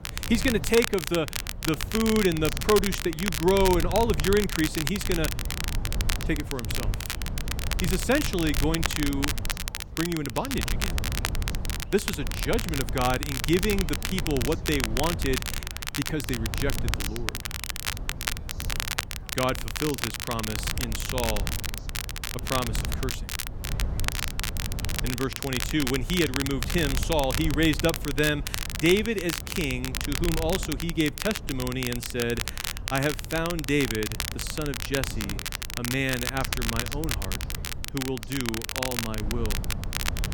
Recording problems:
crackle, like an old record; loud; 4 dB below the speech
low rumble; noticeable; throughout; 15 dB below the speech
background chatter; faint; throughout; 4 voices, 30 dB below the speech

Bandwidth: 18 kHz